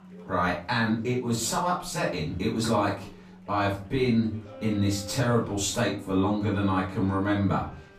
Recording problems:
off-mic speech; far
room echo; slight; dies away in 0.4 s
background music; faint; throughout; 20 dB below the speech
chatter from many people; faint; throughout; 30 dB below the speech

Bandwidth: 15 kHz